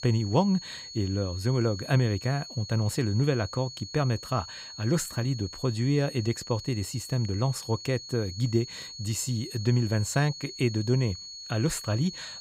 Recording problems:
high-pitched whine; noticeable; throughout; 4.5 kHz, 10 dB below the speech

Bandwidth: 15.5 kHz